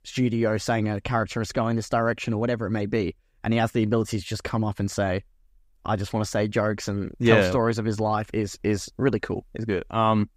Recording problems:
none

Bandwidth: 15.5 kHz